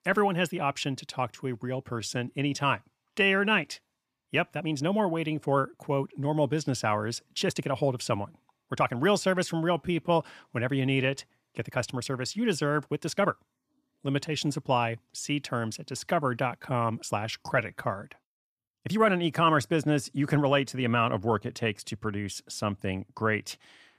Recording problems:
uneven, jittery; strongly; from 2 to 19 s

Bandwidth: 14.5 kHz